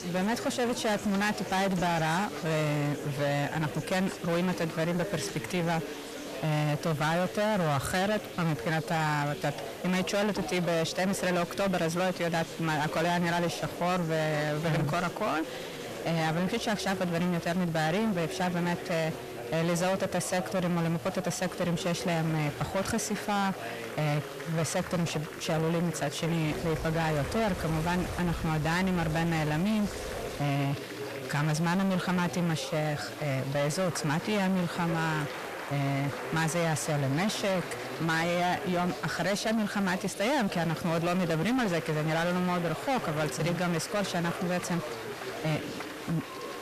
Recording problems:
distortion; heavy; 6 dB below the speech
chatter from many people; loud; throughout; 10 dB below the speech
household noises; noticeable; throughout; 15 dB below the speech
hiss; faint; throughout; 25 dB below the speech

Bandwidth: 14.5 kHz